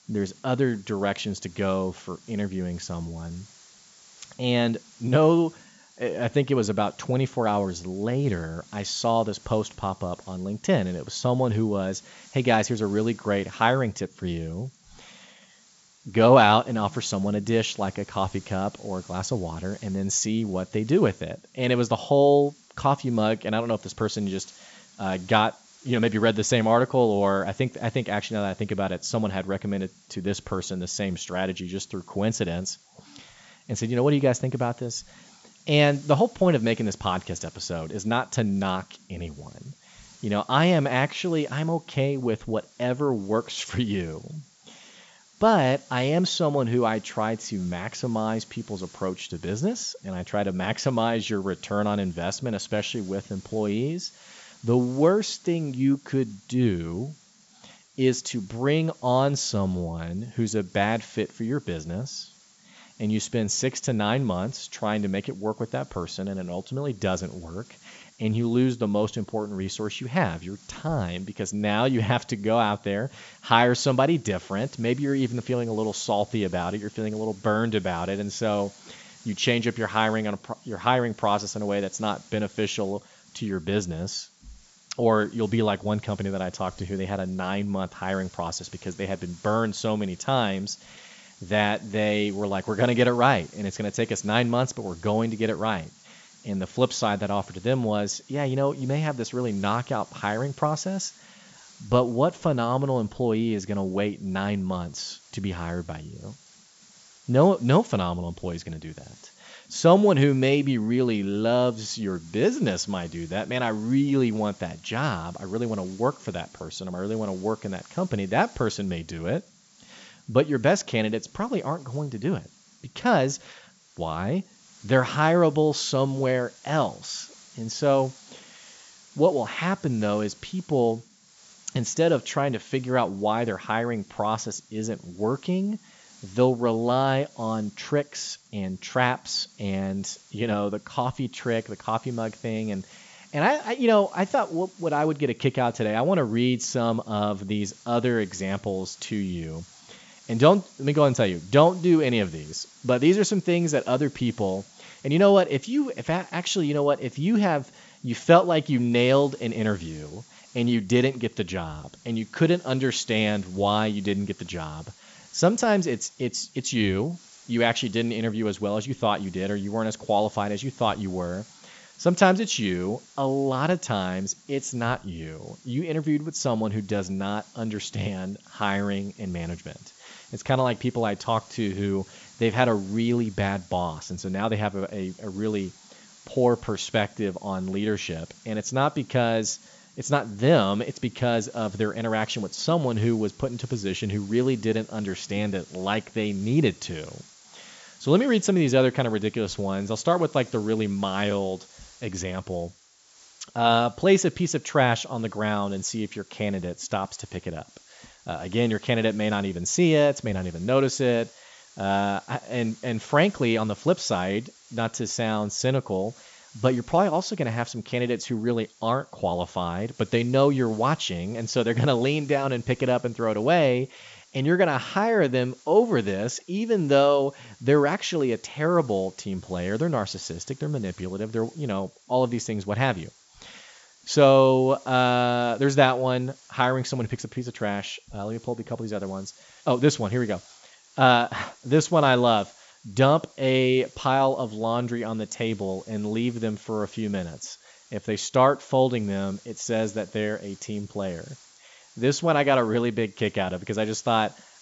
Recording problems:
high frequencies cut off; noticeable; nothing above 8 kHz
hiss; faint; throughout; 25 dB below the speech

